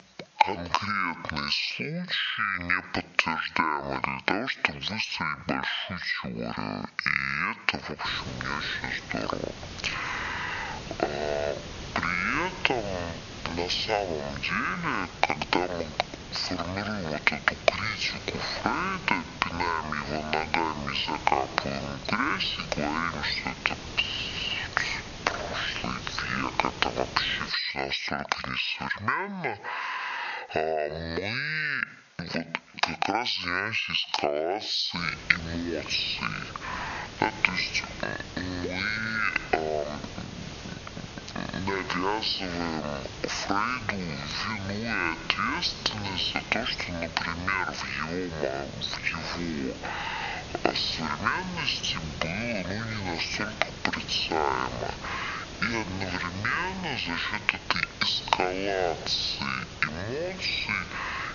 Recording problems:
squashed, flat; heavily
wrong speed and pitch; too slow and too low; 0.5 times normal speed
thin; somewhat; fading below 500 Hz
high frequencies cut off; noticeable; nothing above 7 kHz
hiss; noticeable; from 8 to 28 s and from 35 s on; 10 dB below the speech

